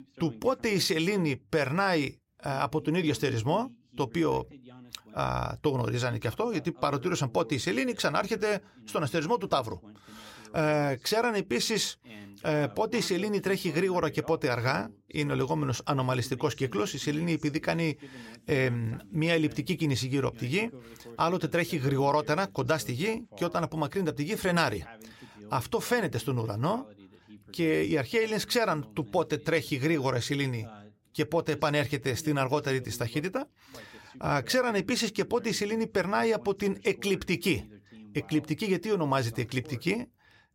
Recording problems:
voice in the background; faint; throughout; 20 dB below the speech

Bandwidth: 16 kHz